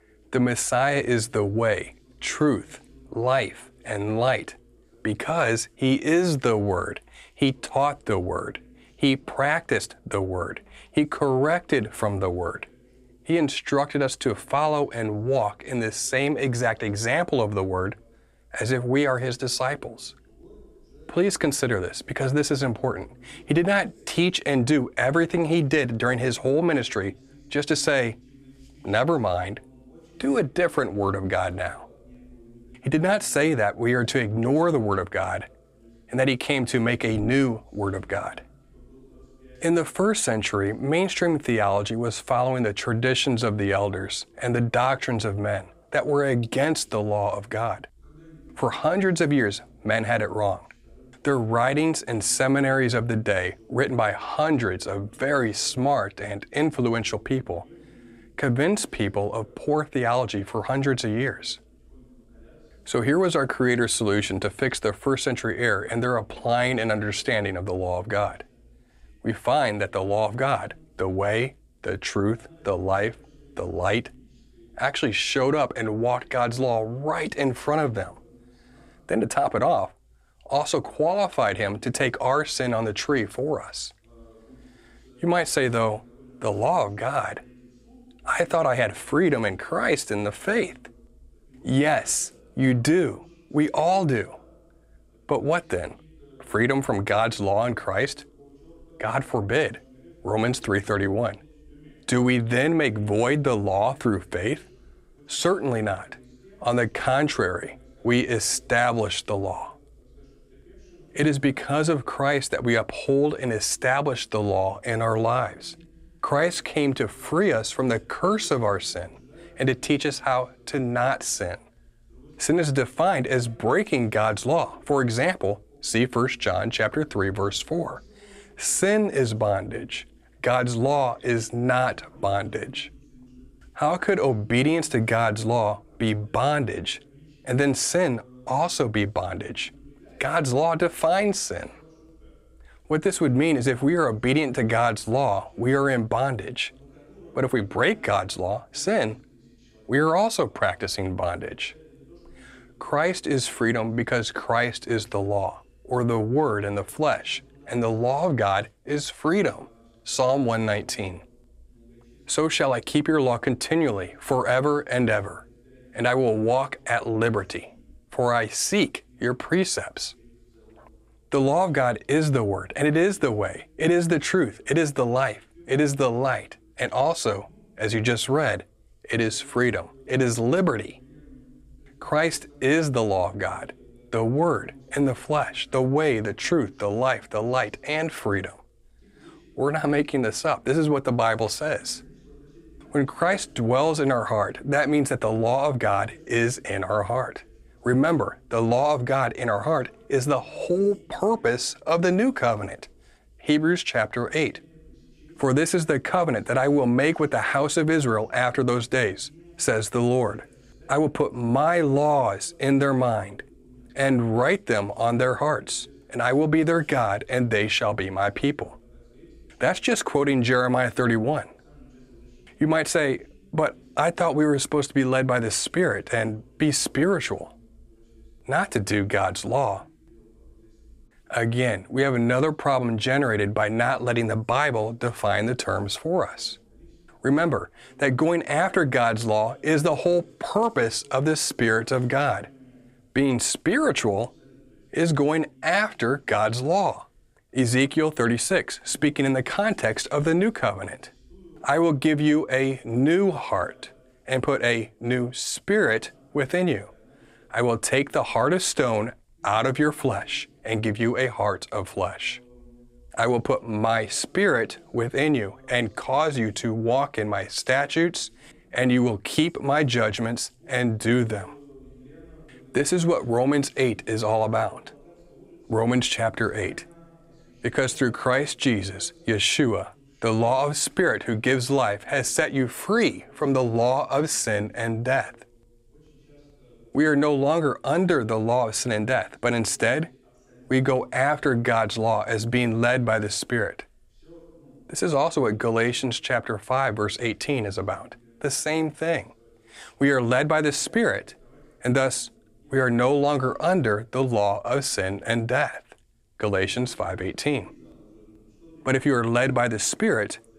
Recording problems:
voice in the background; faint; throughout; 30 dB below the speech

